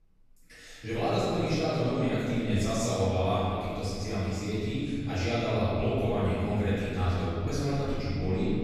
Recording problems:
room echo; strong; dies away in 2.9 s
off-mic speech; far

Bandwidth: 14.5 kHz